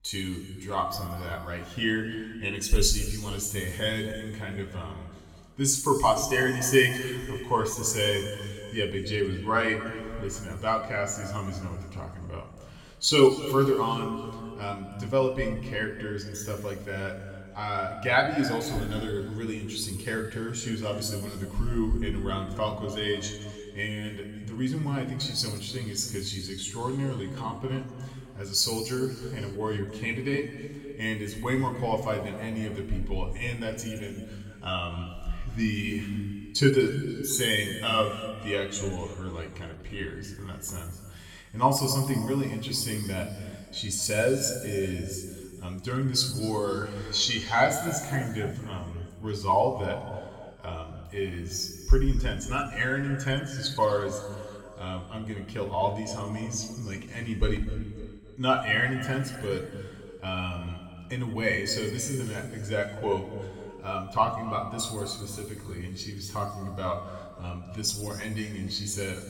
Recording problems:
room echo; noticeable; dies away in 2 s
off-mic speech; somewhat distant

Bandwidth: 17 kHz